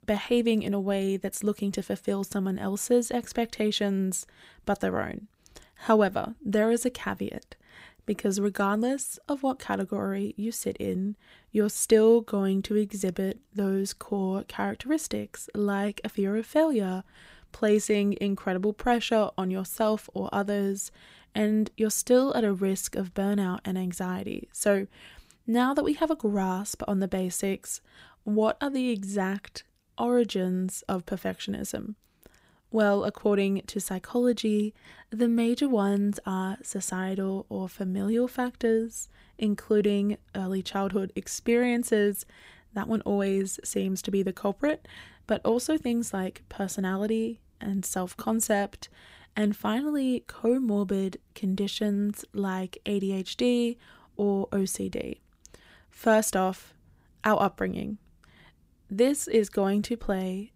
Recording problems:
none

